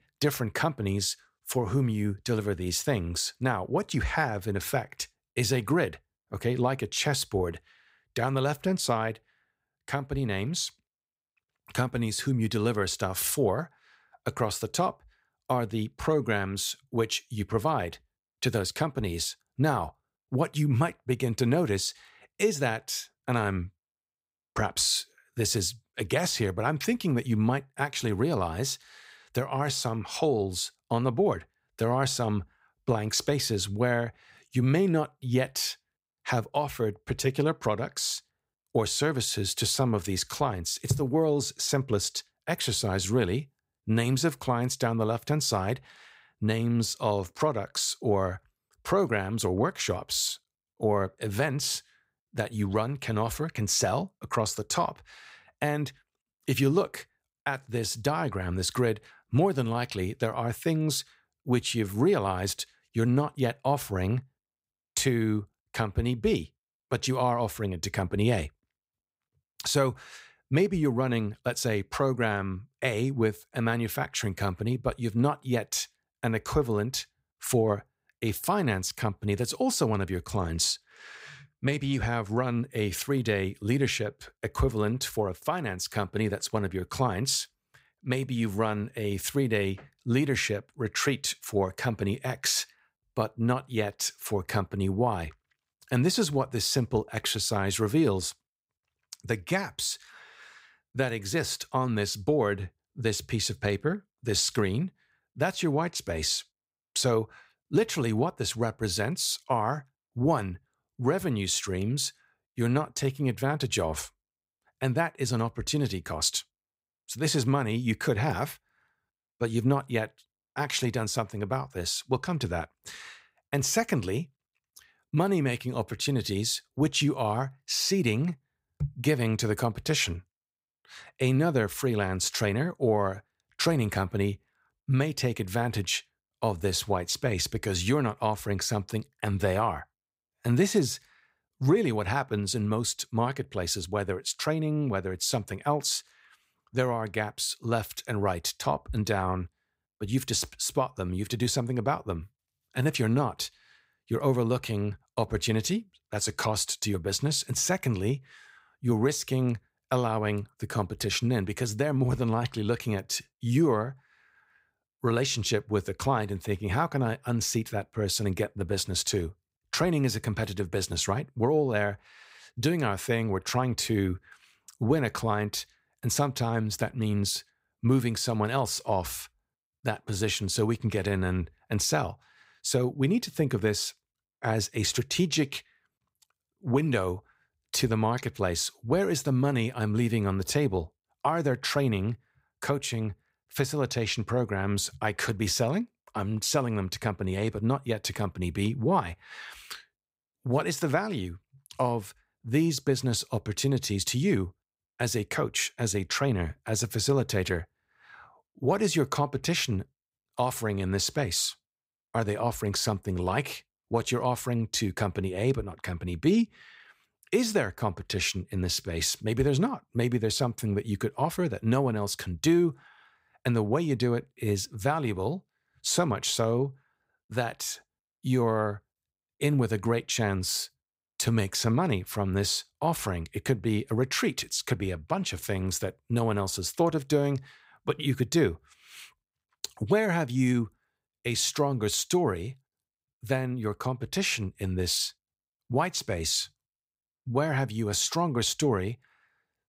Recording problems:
none

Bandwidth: 15.5 kHz